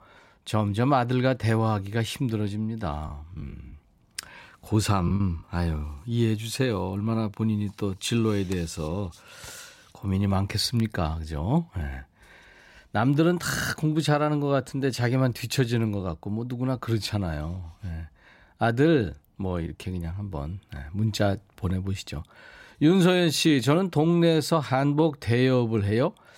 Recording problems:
choppy; very; from 3 to 5 s; 8% of the speech affected

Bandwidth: 16 kHz